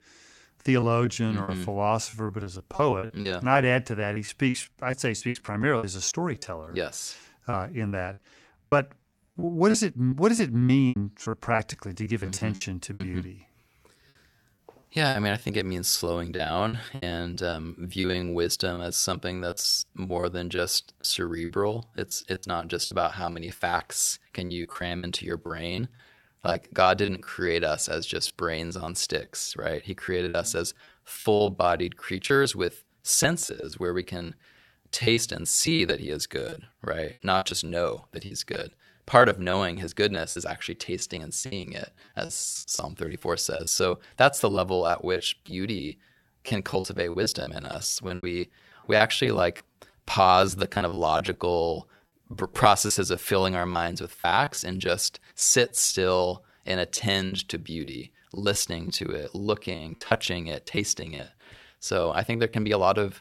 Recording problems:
choppy; very; 13% of the speech affected

